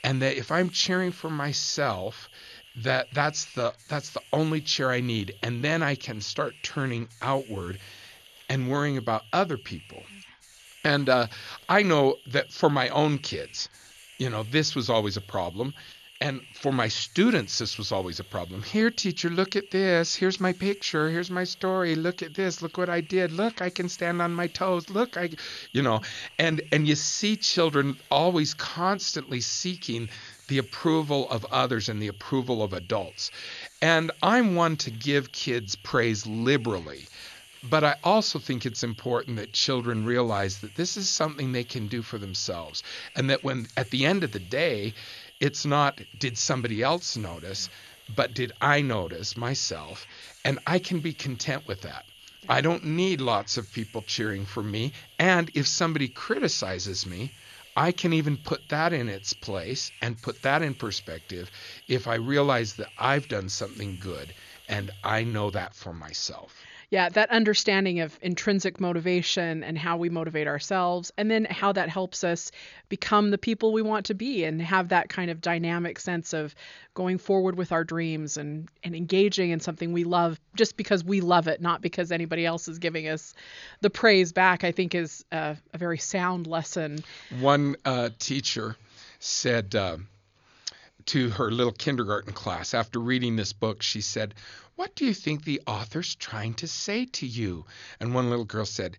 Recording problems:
high frequencies cut off; noticeable; nothing above 7 kHz
hiss; faint; until 1:06; 20 dB below the speech

